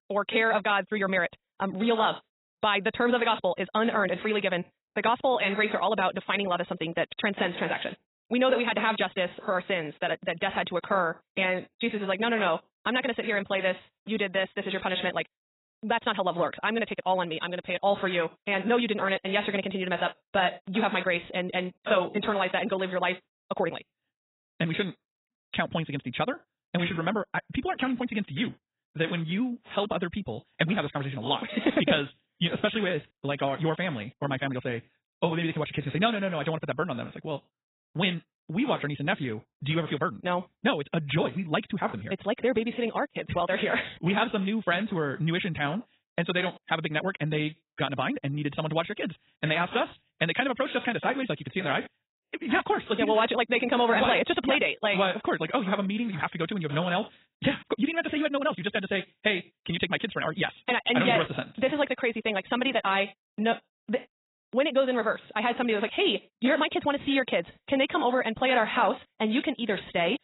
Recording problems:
garbled, watery; badly; nothing above 4 kHz
wrong speed, natural pitch; too fast; 1.7 times normal speed

